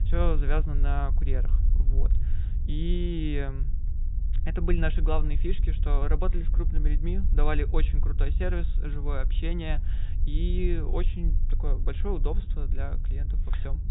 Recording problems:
high frequencies cut off; severe; nothing above 4 kHz
low rumble; noticeable; throughout; 15 dB below the speech

